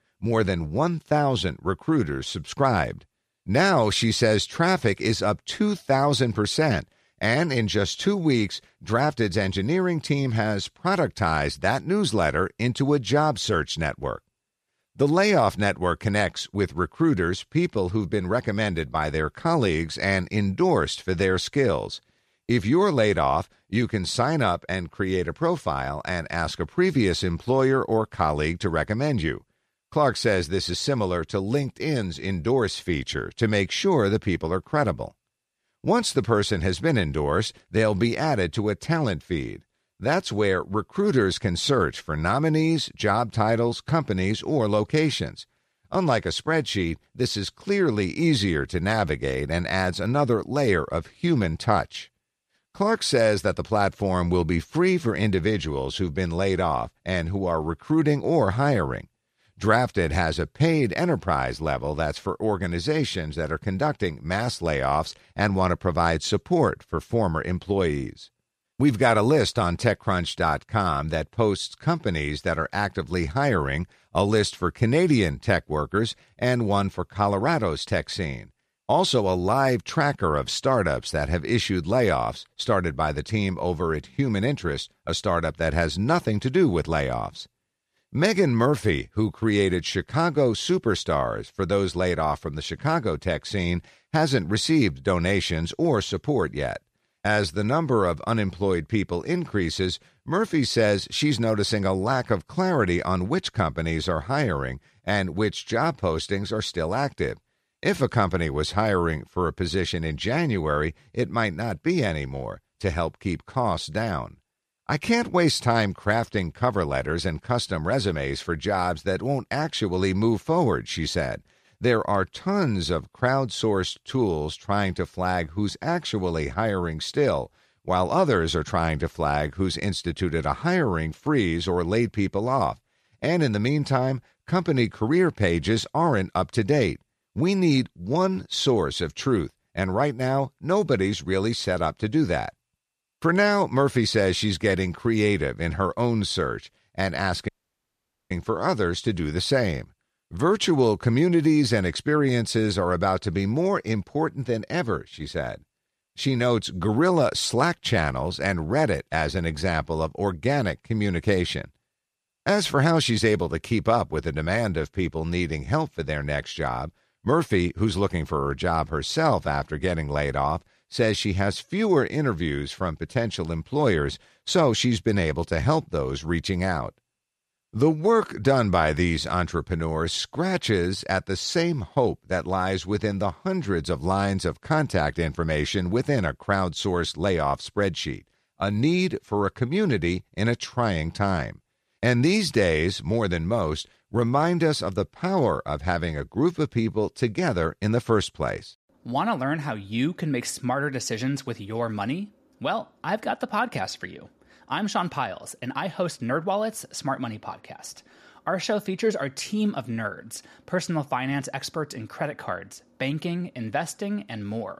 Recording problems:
audio cutting out; at 2:27 for 1 s

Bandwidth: 14.5 kHz